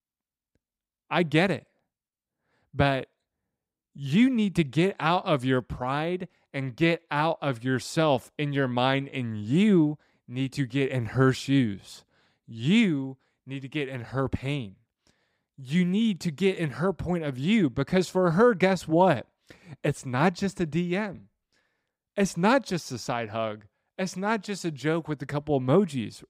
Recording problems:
none

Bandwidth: 15.5 kHz